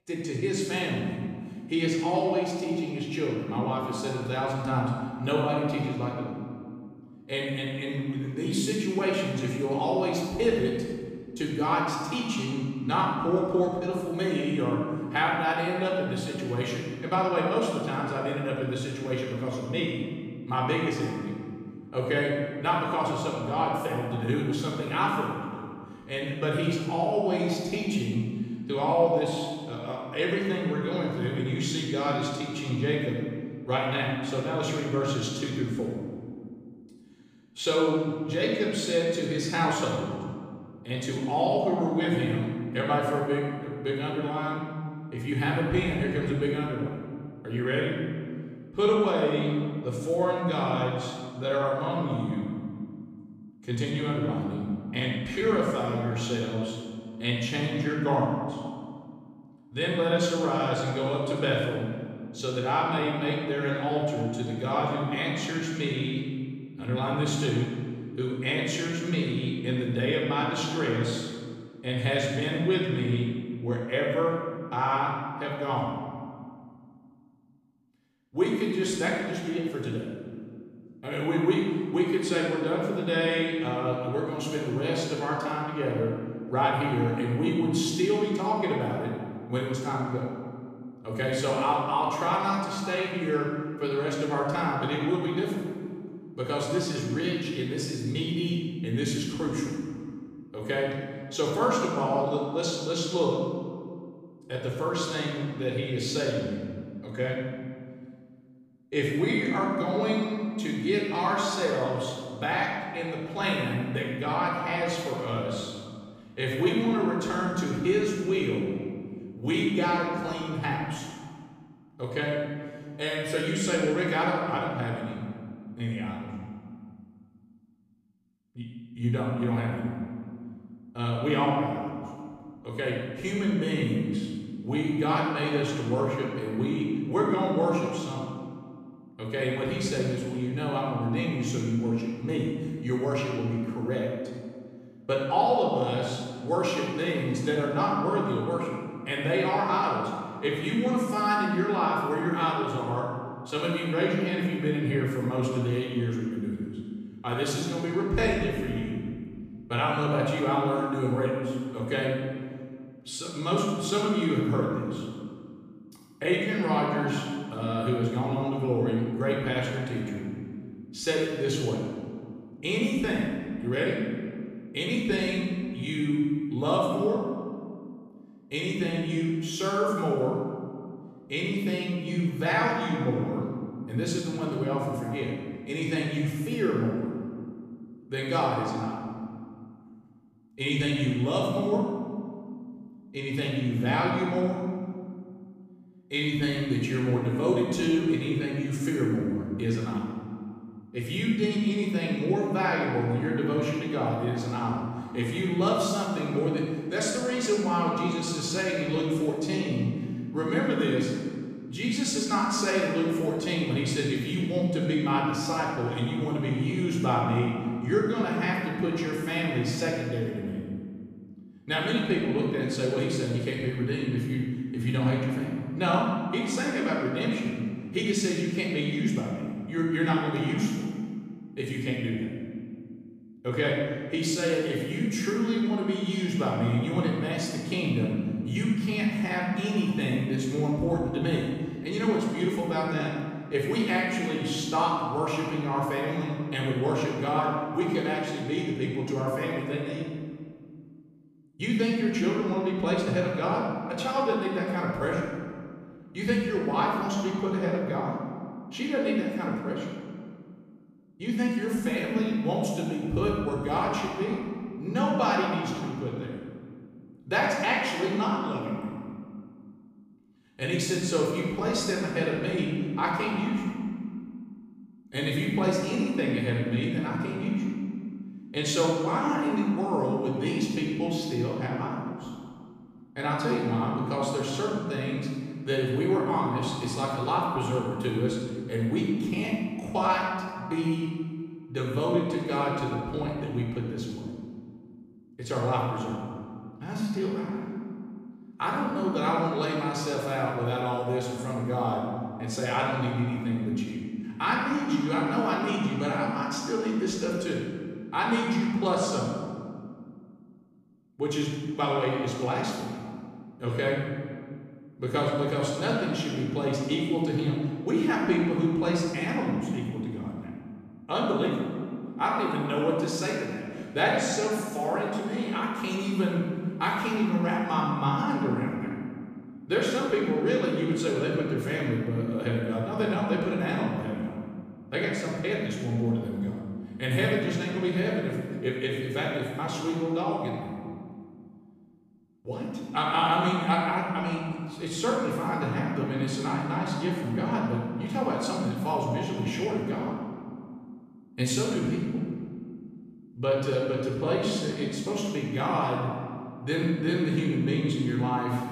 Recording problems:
room echo; strong; dies away in 1.8 s
off-mic speech; far

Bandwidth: 15 kHz